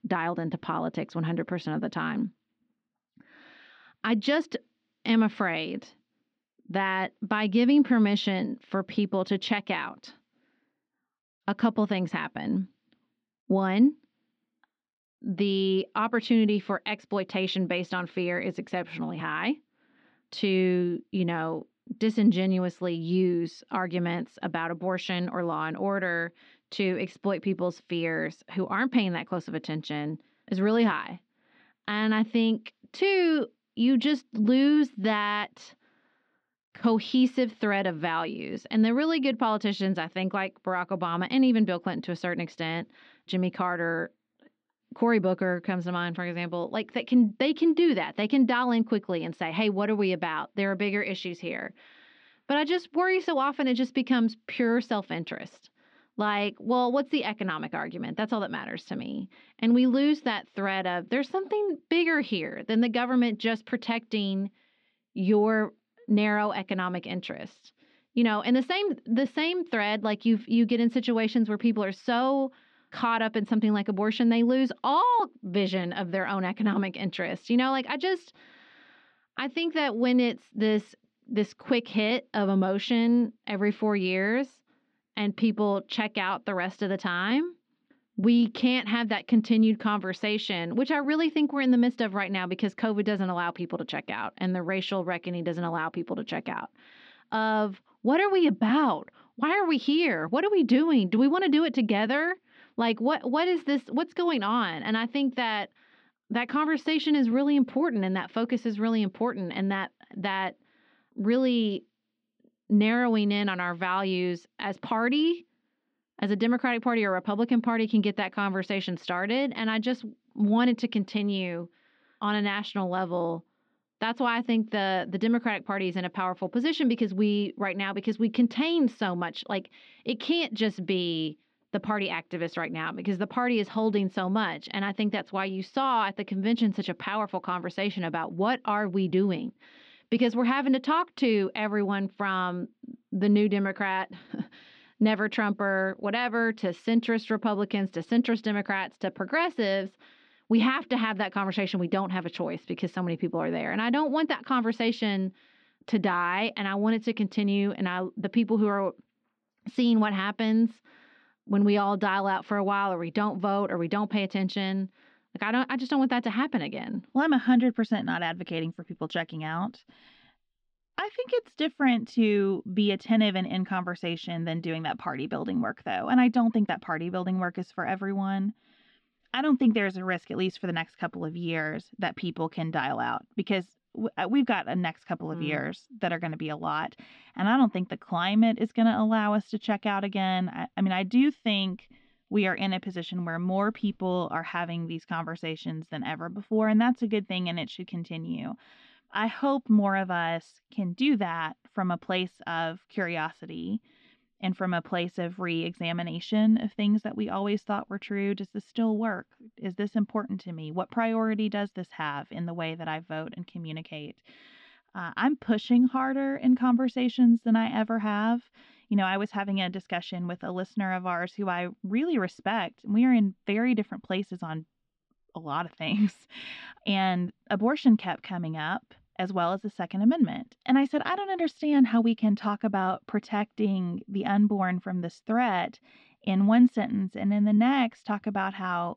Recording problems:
muffled; slightly; fading above 4 kHz

